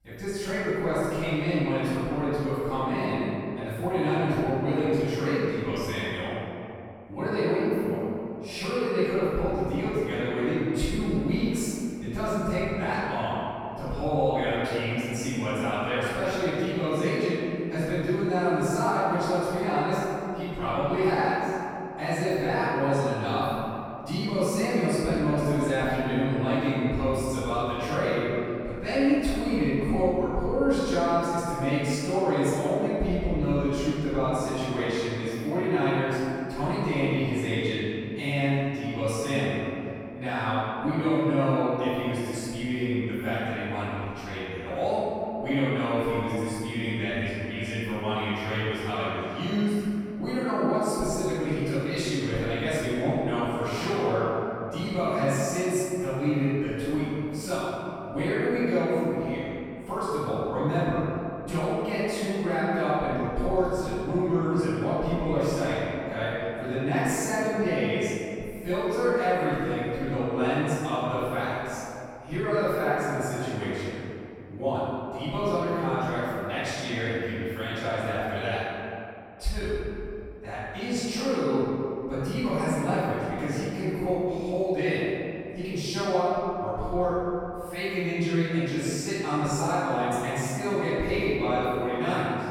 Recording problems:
room echo; strong; dies away in 2.4 s
off-mic speech; far

